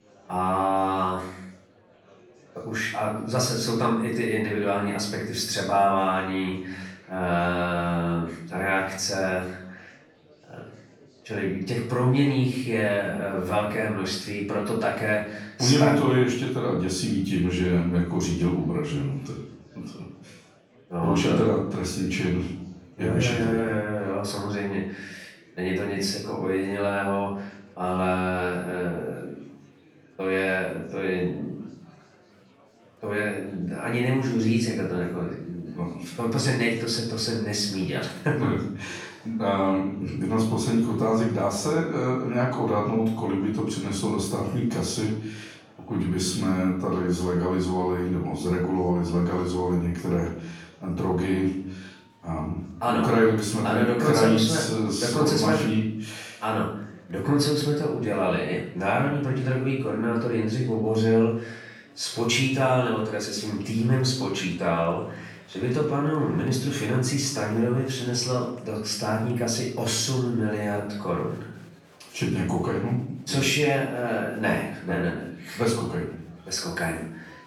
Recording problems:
off-mic speech; far
room echo; noticeable; dies away in 0.6 s
murmuring crowd; faint; throughout; 30 dB below the speech

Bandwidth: 18.5 kHz